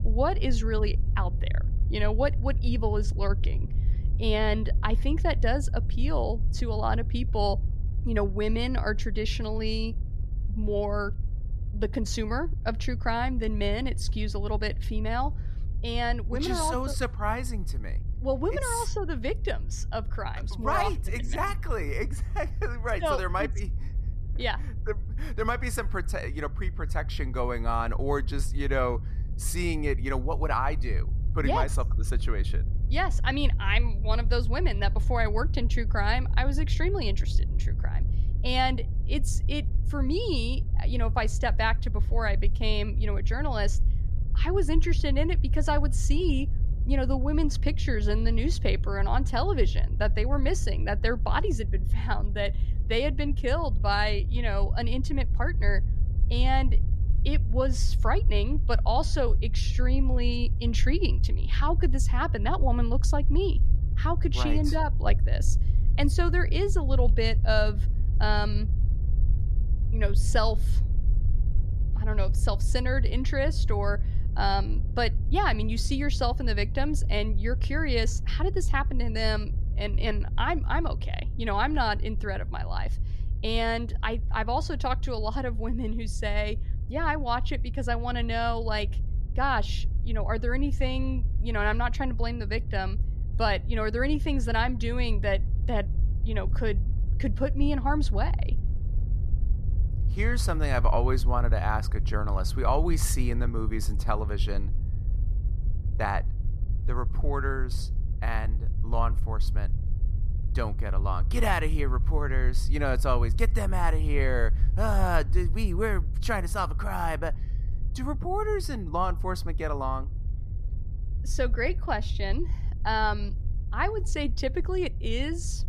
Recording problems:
low rumble; noticeable; throughout; 20 dB below the speech

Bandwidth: 14.5 kHz